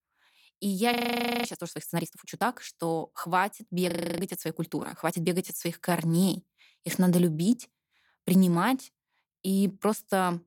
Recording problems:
audio freezing; at 1 s for 0.5 s and at 4 s

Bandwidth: 17.5 kHz